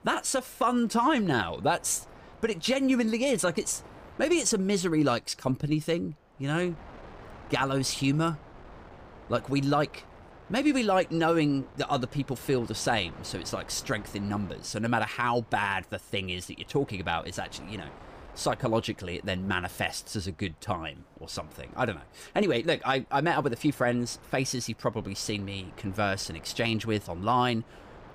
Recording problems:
wind noise on the microphone; occasional gusts; 20 dB below the speech

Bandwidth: 15 kHz